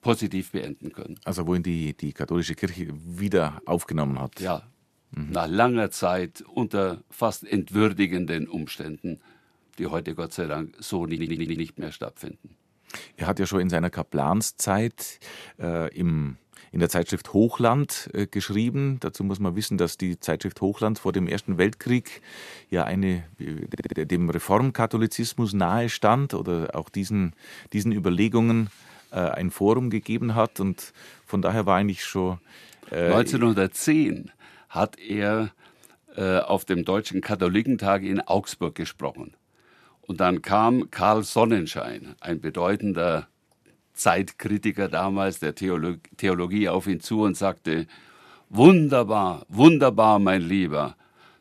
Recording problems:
audio stuttering; at 11 s and at 24 s

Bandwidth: 14 kHz